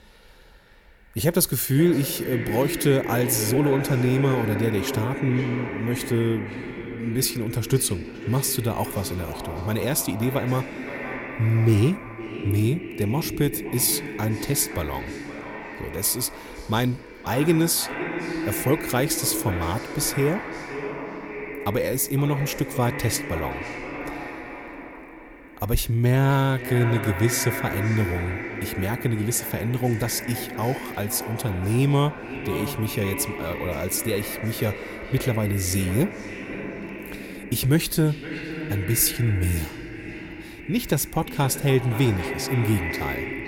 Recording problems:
echo of what is said; strong; throughout; 520 ms later, 8 dB below the speech

